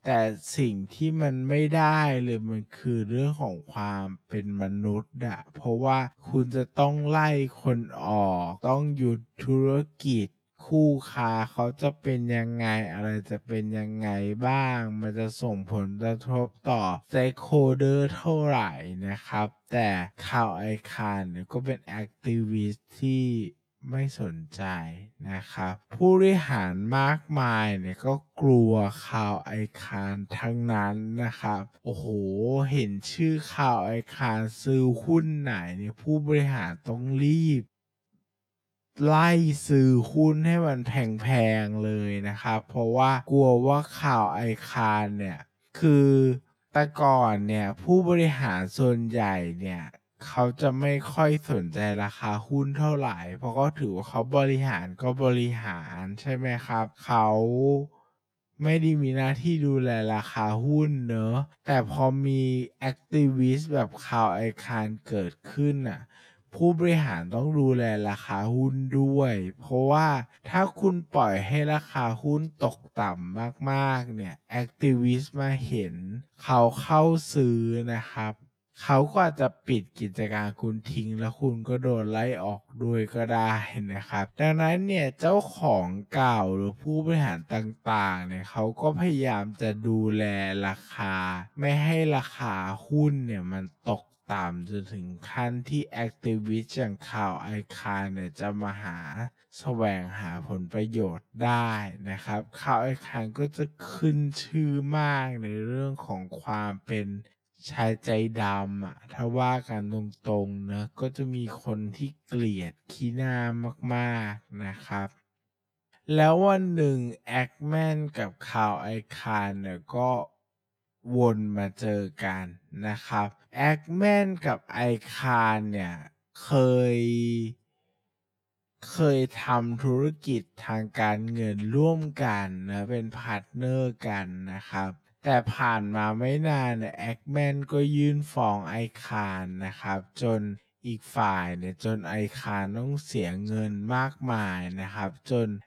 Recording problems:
wrong speed, natural pitch; too slow; 0.5 times normal speed

